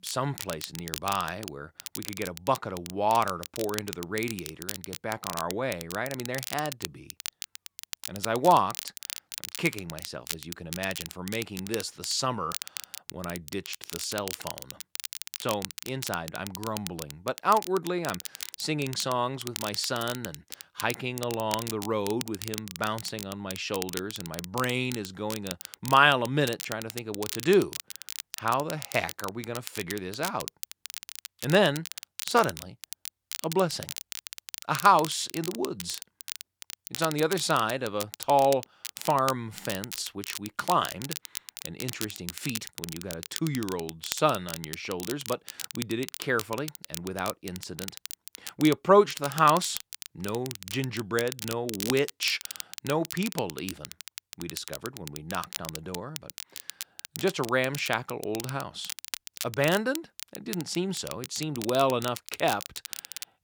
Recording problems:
crackle, like an old record; loud; 9 dB below the speech

